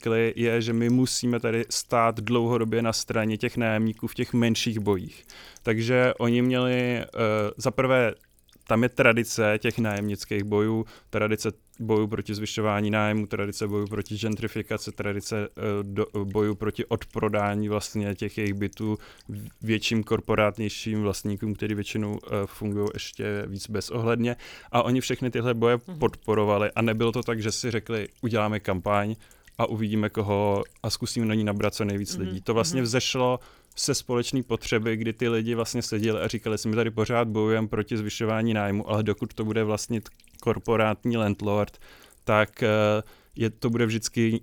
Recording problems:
electrical hum; faint; throughout; 60 Hz, 30 dB below the speech

